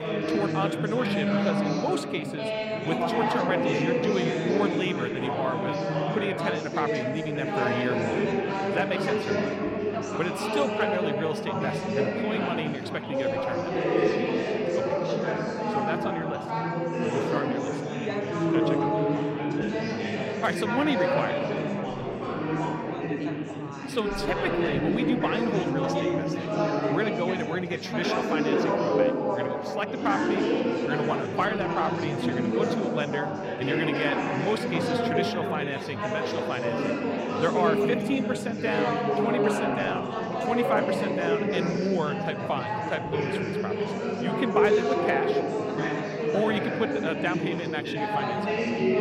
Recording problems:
chatter from many people; very loud; throughout; 4 dB above the speech

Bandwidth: 16.5 kHz